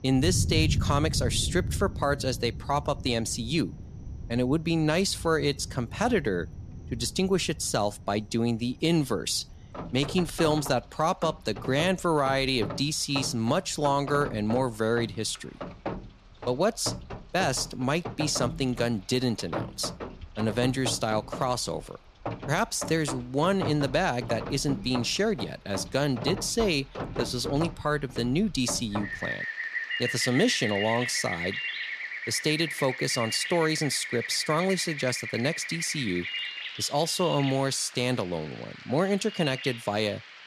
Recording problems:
rain or running water; loud; throughout; 8 dB below the speech

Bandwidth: 14.5 kHz